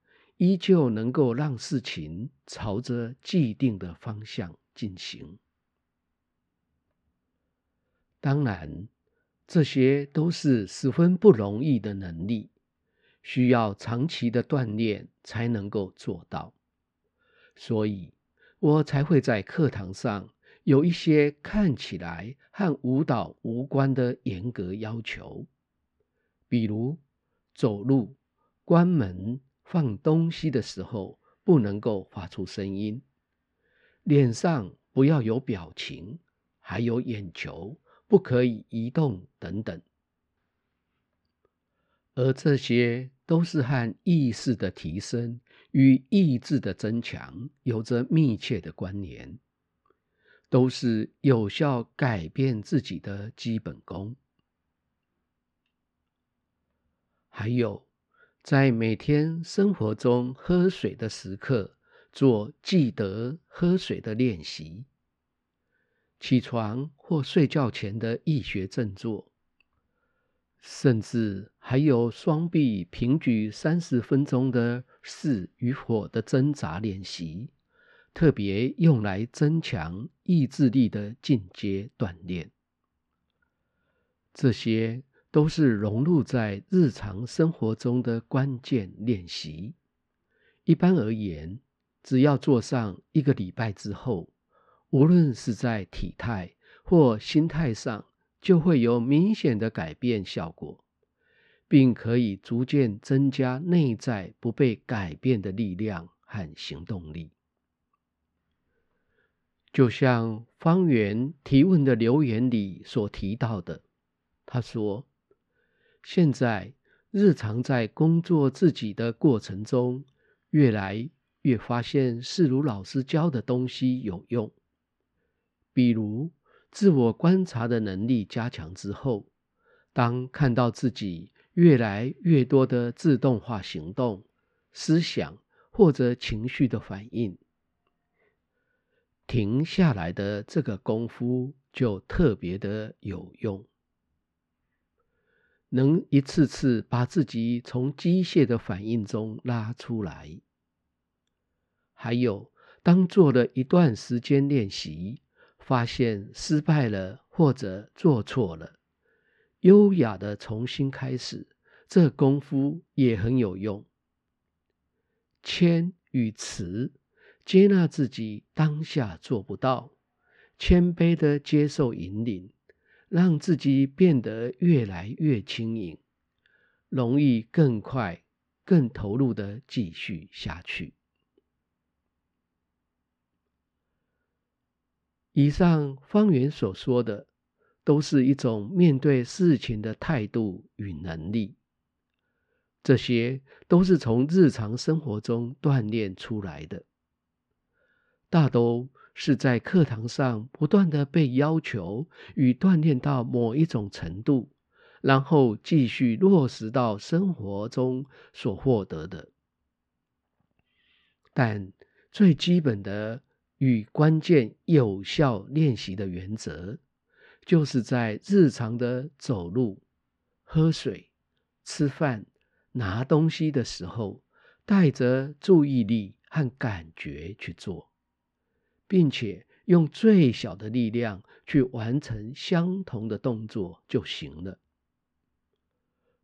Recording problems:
muffled; slightly; fading above 2.5 kHz

